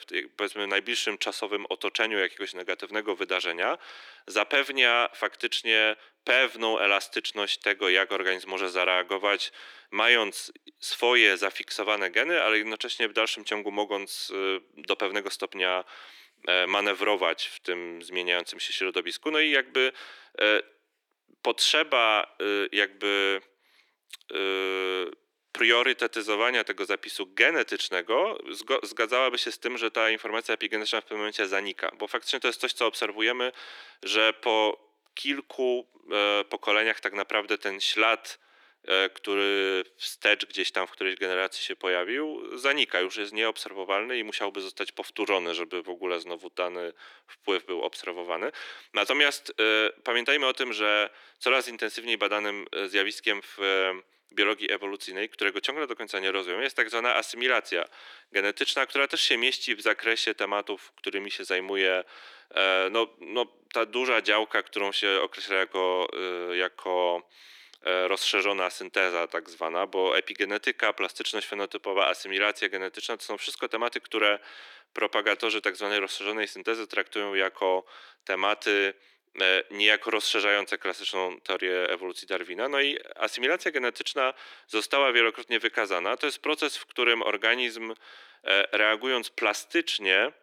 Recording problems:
thin; very; fading below 300 Hz

